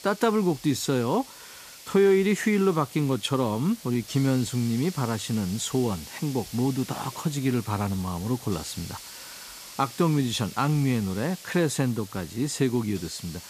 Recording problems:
hiss; noticeable; throughout; 15 dB below the speech

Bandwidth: 14.5 kHz